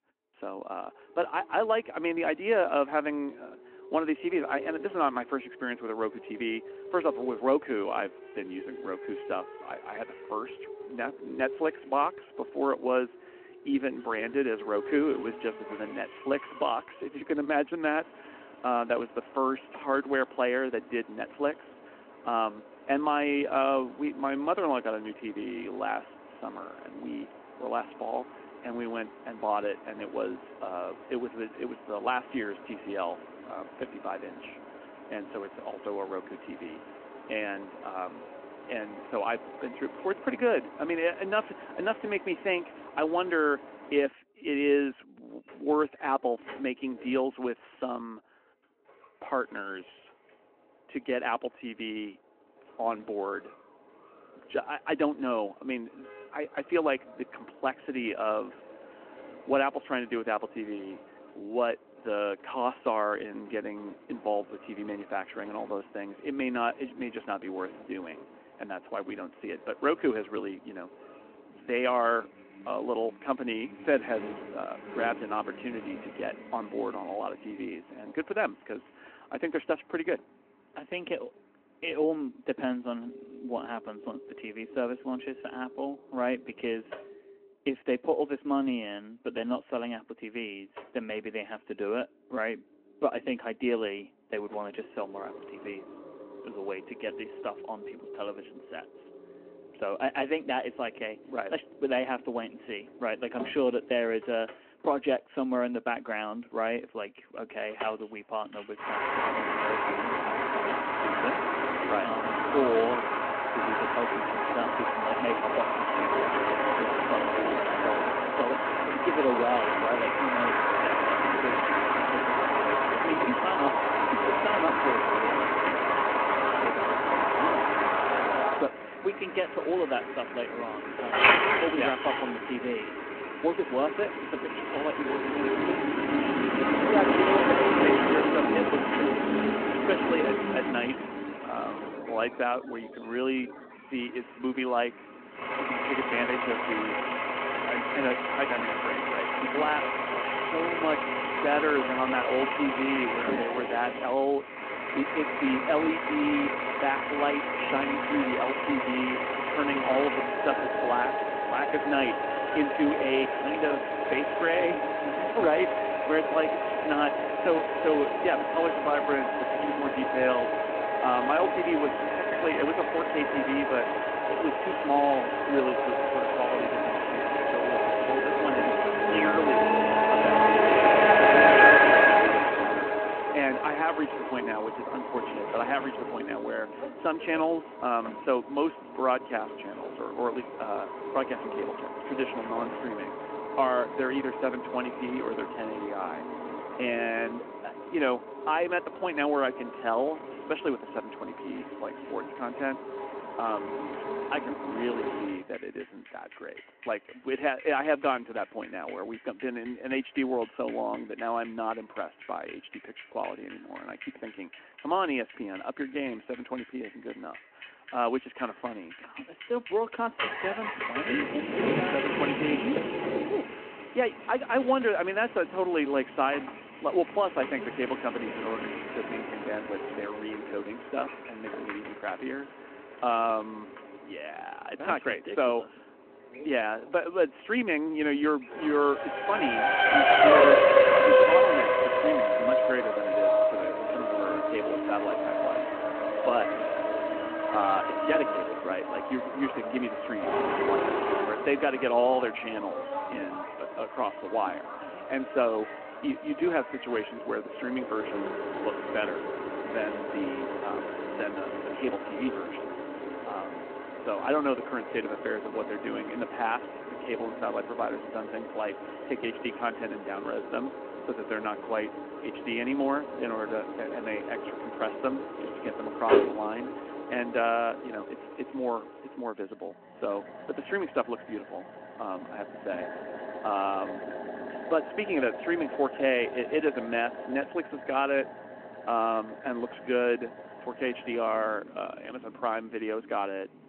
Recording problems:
phone-call audio
traffic noise; very loud; throughout; 4 dB above the speech

